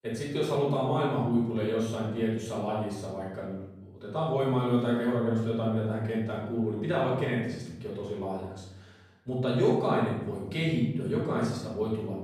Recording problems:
off-mic speech; far
room echo; noticeable; dies away in 1 s

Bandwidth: 15 kHz